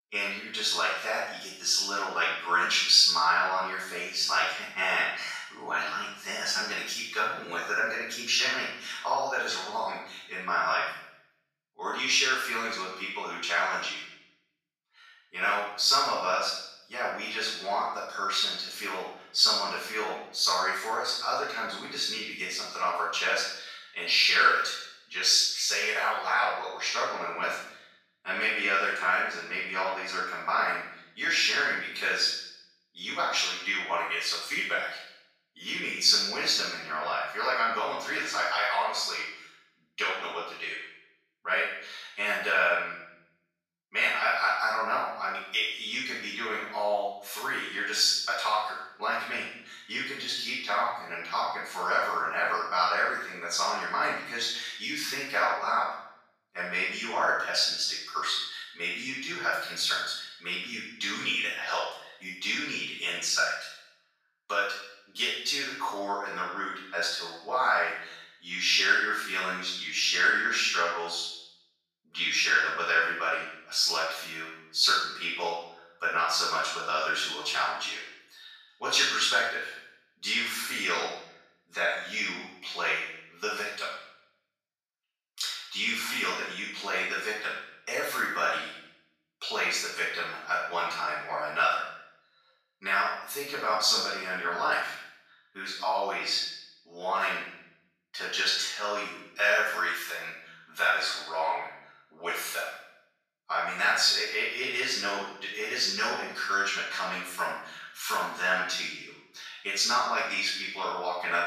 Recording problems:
room echo; strong; dies away in 0.7 s
off-mic speech; far
thin; very; fading below 700 Hz

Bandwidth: 14.5 kHz